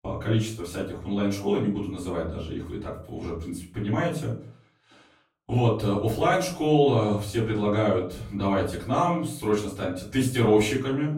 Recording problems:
off-mic speech; far
room echo; slight; dies away in 0.4 s

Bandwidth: 16 kHz